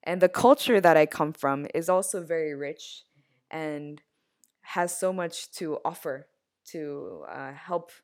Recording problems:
none

